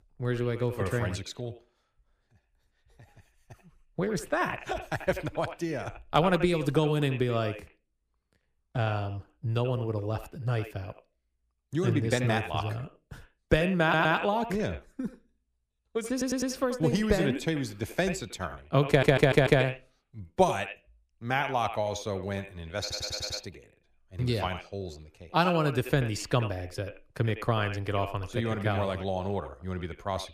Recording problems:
echo of what is said; strong; throughout; 80 ms later, 10 dB below the speech
audio stuttering; 4 times, first at 14 s

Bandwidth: 15 kHz